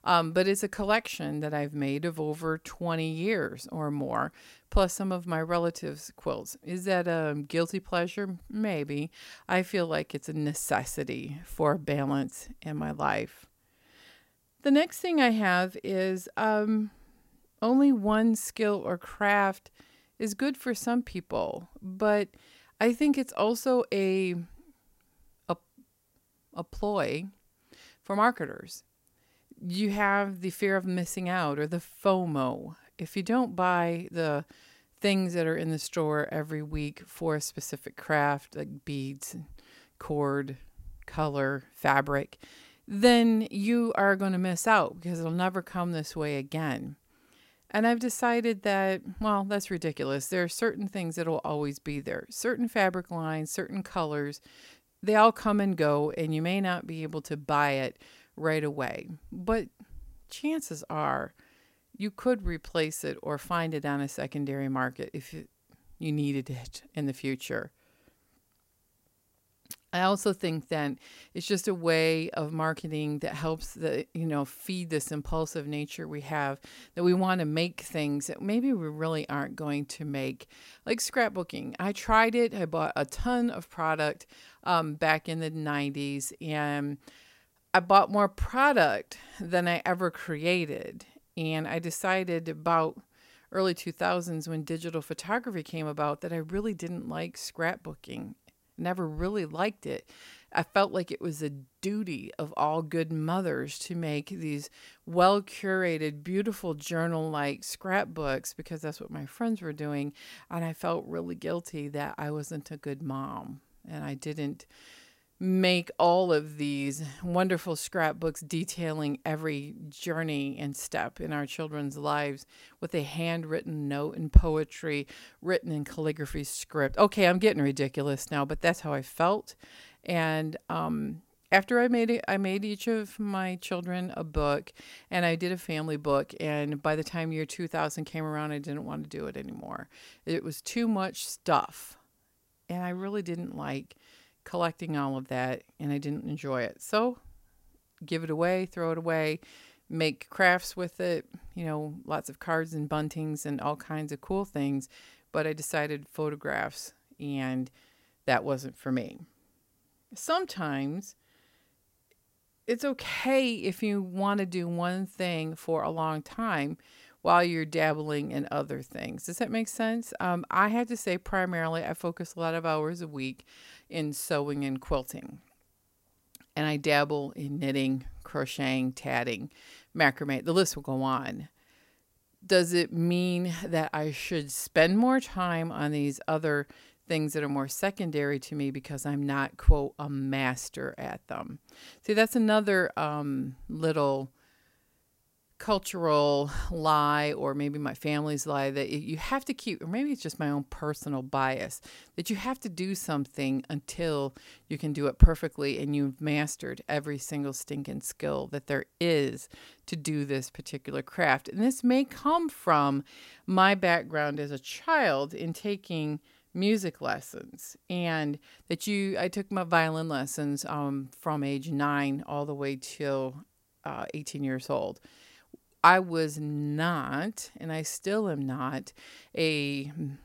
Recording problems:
none

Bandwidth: 16 kHz